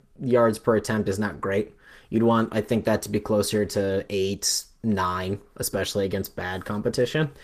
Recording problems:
garbled, watery; slightly; nothing above 14.5 kHz

